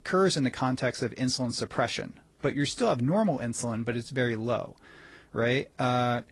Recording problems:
garbled, watery; slightly

